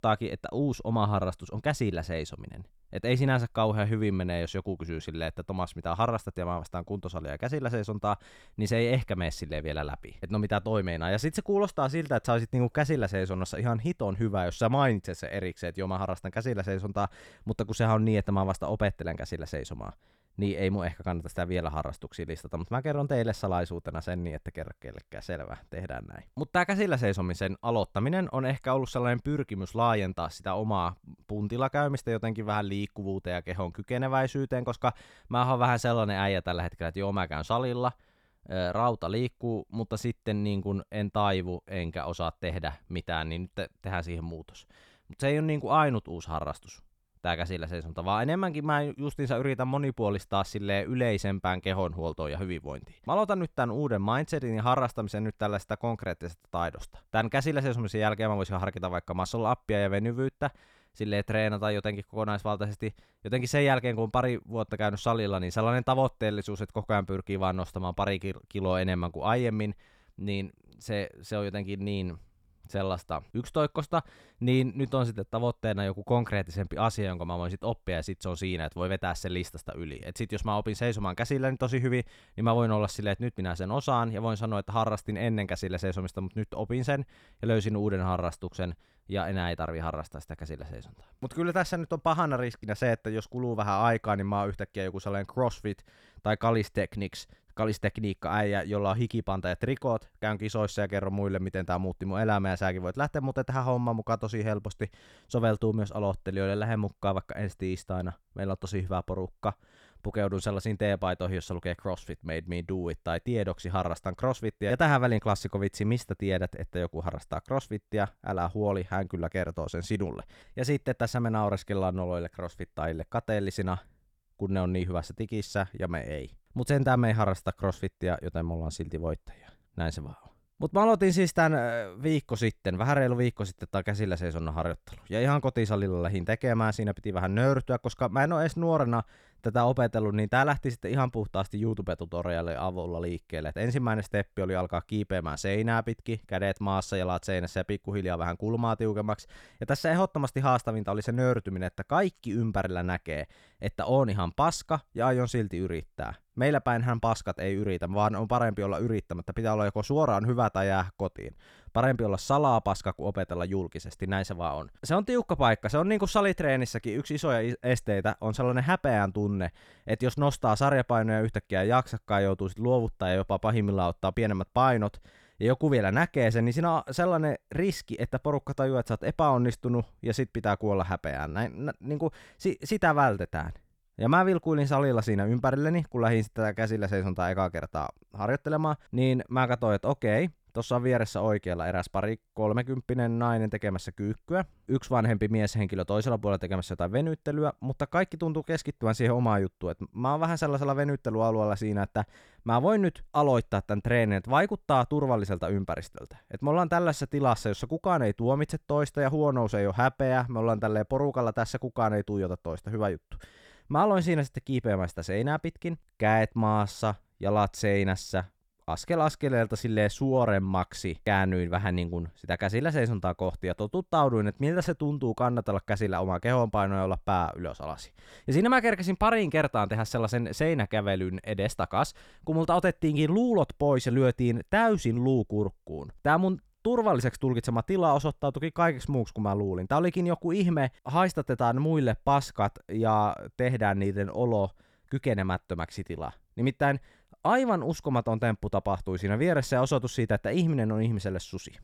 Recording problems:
none

